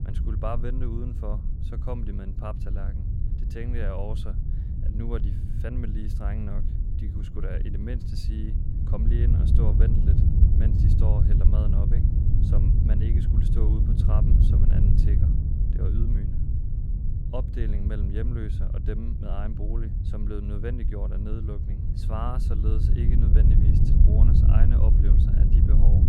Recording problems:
wind noise on the microphone; heavy; as loud as the speech

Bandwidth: 16.5 kHz